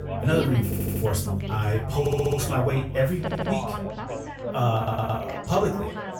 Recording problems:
off-mic speech; far
room echo; slight; dies away in 0.3 s
background music; loud; throughout; 8 dB below the speech
background chatter; loud; throughout; 4 voices, 6 dB below the speech
audio stuttering; 4 times, first at 0.5 s

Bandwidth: 18 kHz